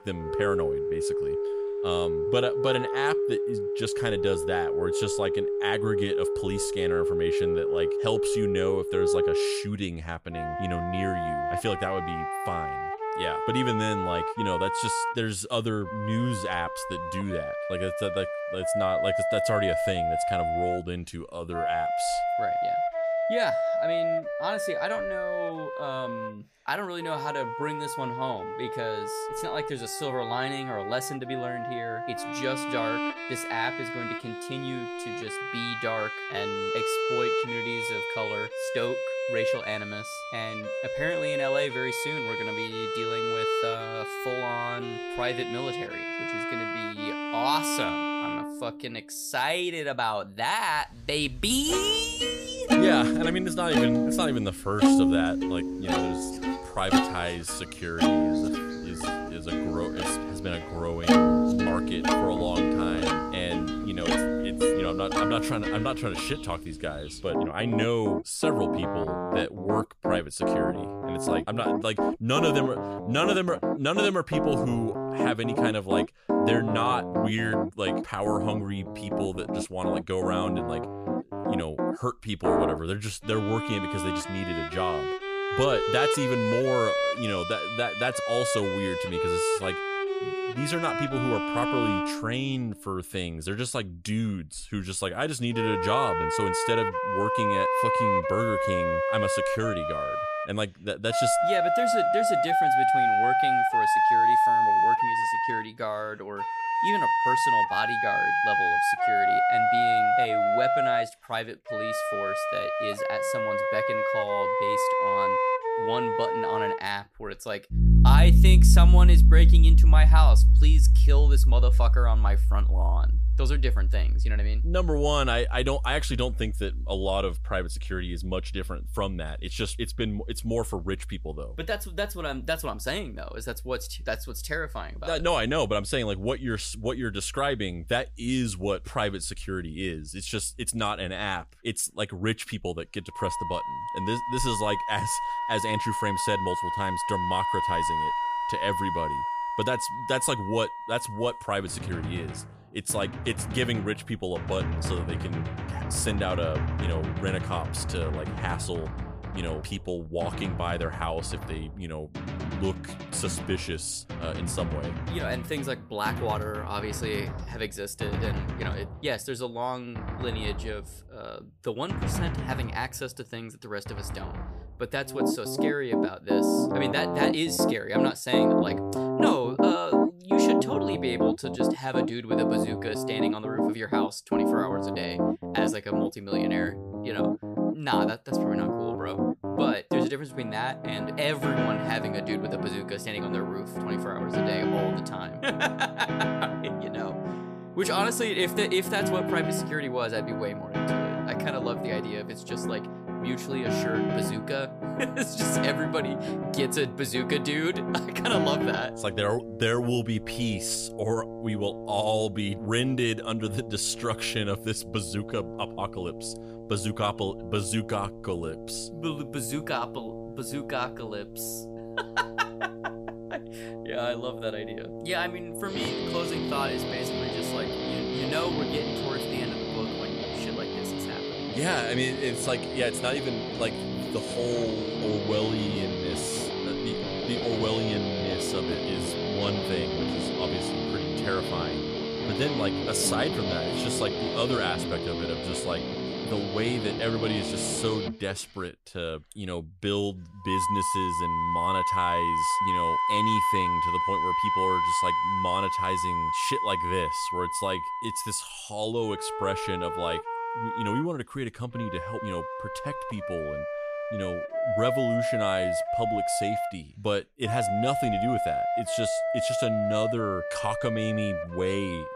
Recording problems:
background music; very loud; throughout; 4 dB above the speech

